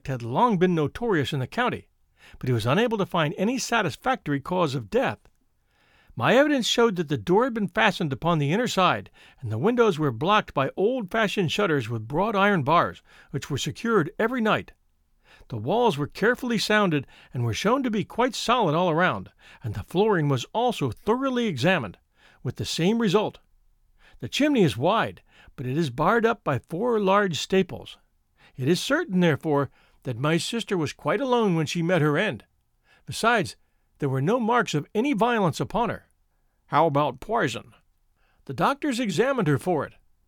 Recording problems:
none

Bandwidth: 18.5 kHz